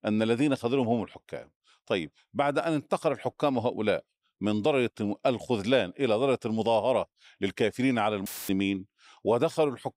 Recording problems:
audio cutting out; filled with static; at 8.5 s

